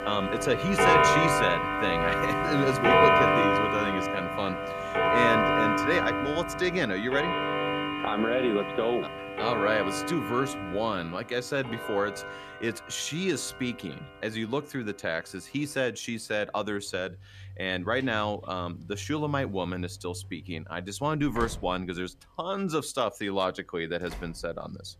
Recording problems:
household noises; very loud; throughout; 4 dB above the speech

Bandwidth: 14.5 kHz